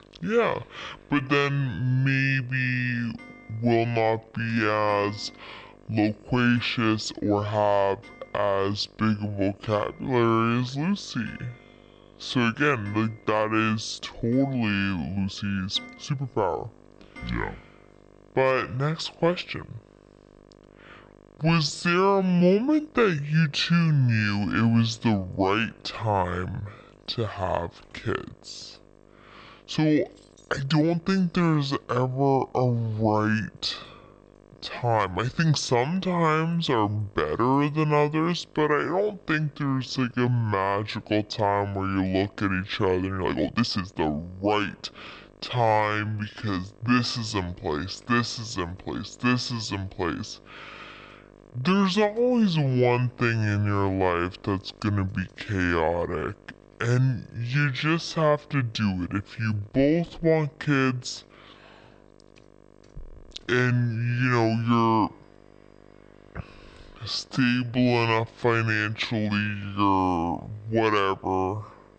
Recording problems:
wrong speed and pitch; too slow and too low; 0.6 times normal speed
electrical hum; faint; throughout; 50 Hz, 30 dB below the speech
household noises; faint; throughout; 30 dB below the speech
uneven, jittery; strongly; from 4.5 s to 1:08

